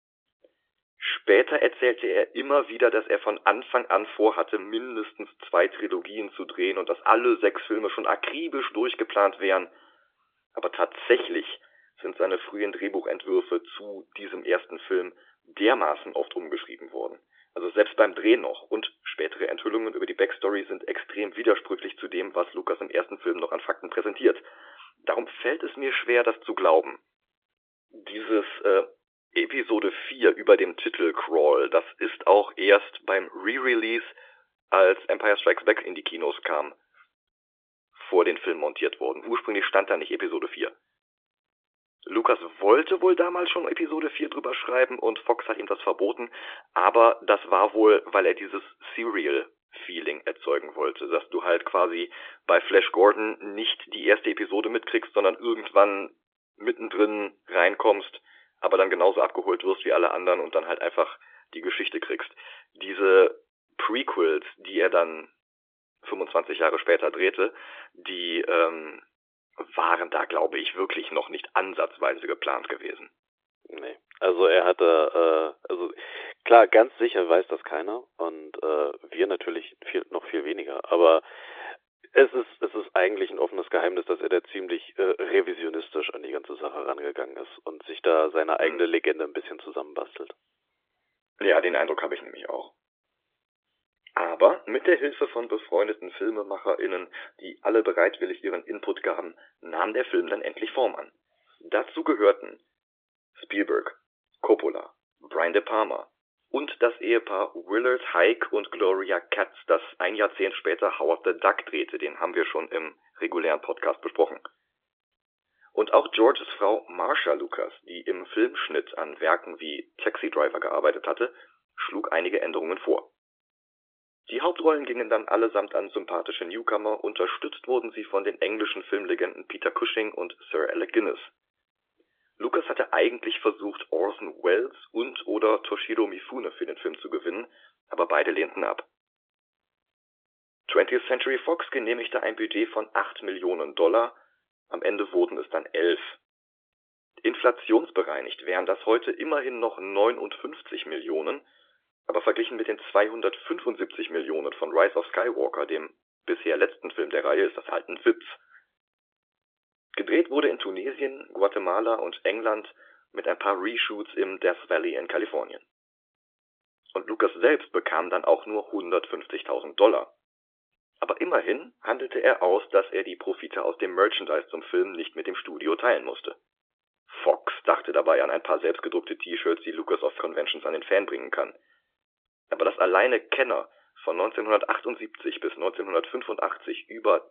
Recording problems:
phone-call audio; nothing above 3.5 kHz

